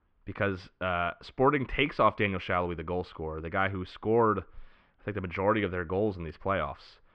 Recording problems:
muffled; very; fading above 3 kHz

